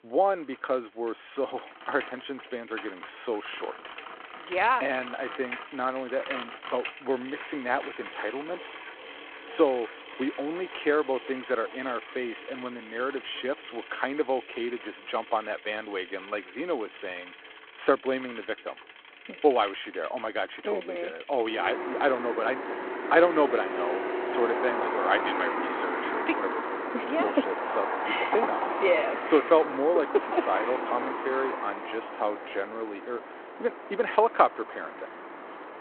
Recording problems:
phone-call audio
traffic noise; loud; throughout; 6 dB below the speech

